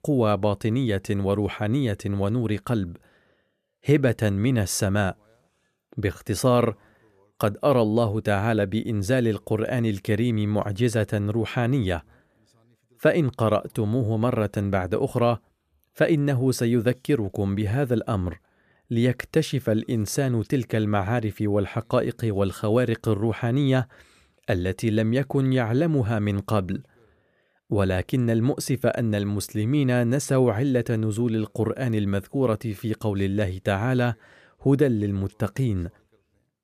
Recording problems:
none

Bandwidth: 14.5 kHz